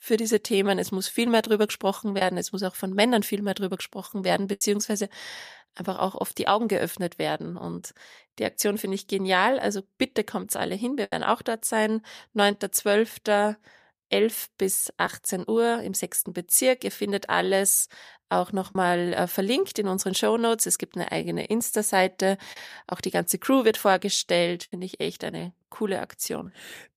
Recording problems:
choppy; occasionally; 1% of the speech affected

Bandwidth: 14.5 kHz